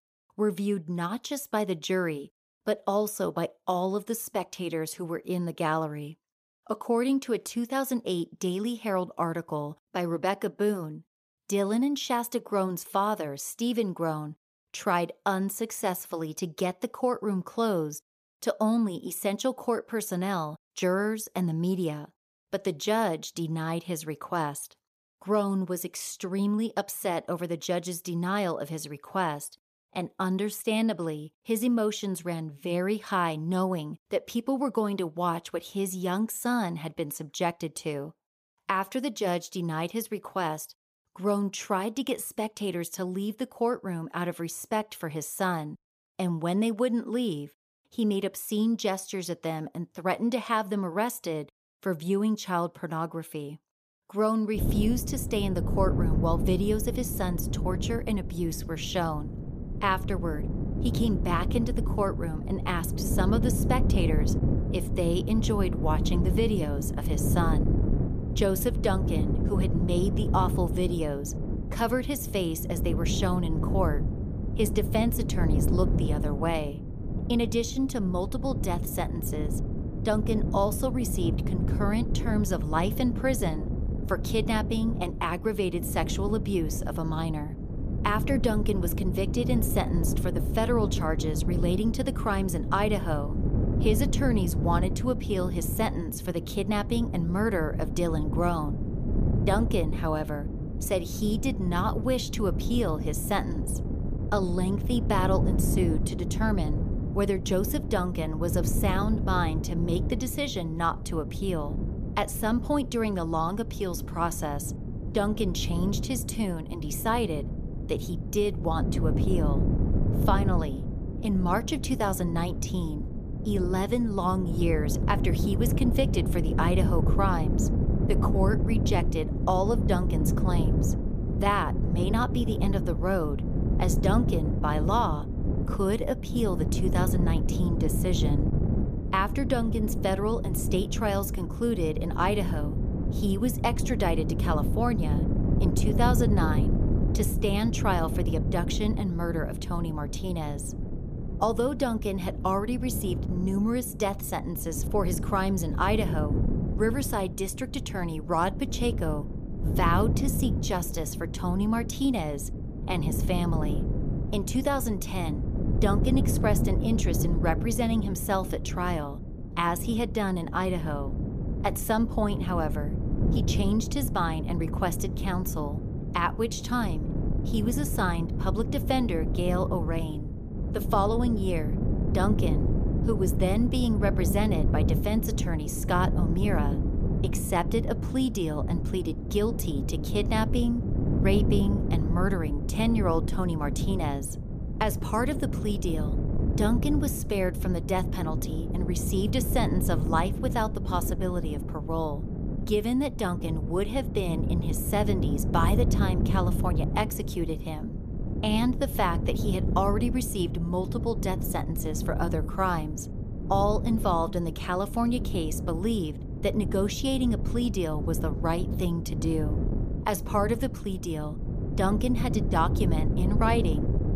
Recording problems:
wind noise on the microphone; heavy; from 55 s on; 8 dB below the speech

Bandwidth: 15 kHz